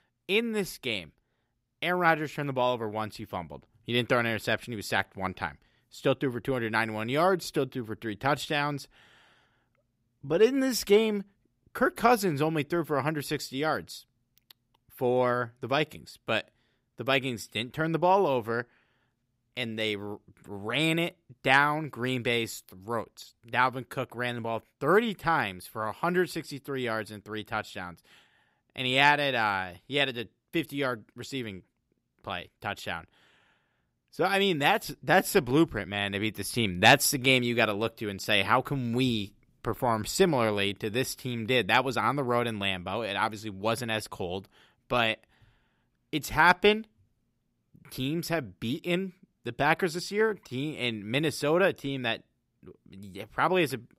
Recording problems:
none

